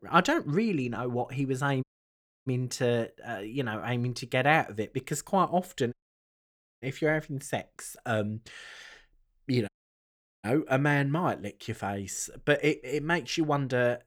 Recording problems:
audio cutting out; at 2 s for 0.5 s, at 6 s for 1 s and at 9.5 s for 0.5 s

